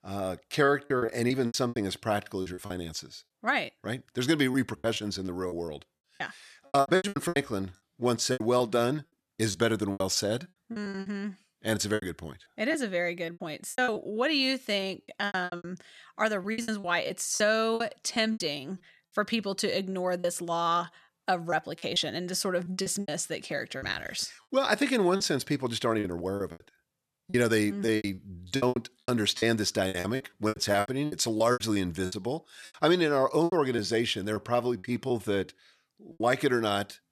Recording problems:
choppy; very; 14% of the speech affected

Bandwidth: 13.5 kHz